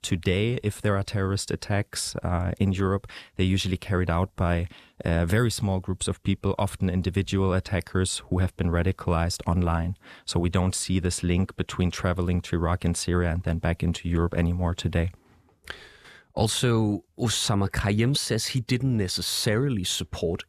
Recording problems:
none

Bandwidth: 14.5 kHz